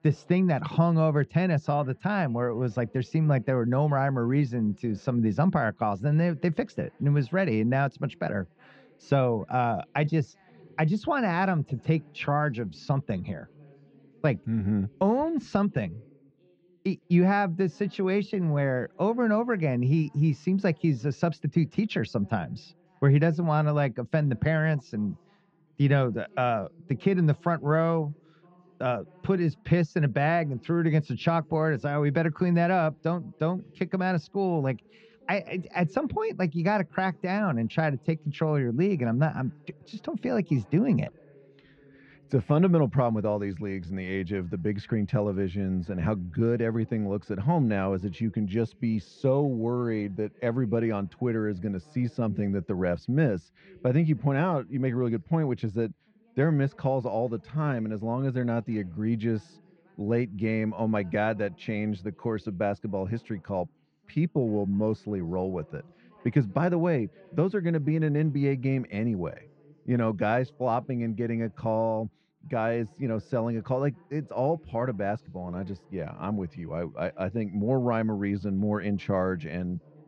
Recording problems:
muffled; slightly; fading above 2.5 kHz
background chatter; faint; throughout; 2 voices, 30 dB below the speech

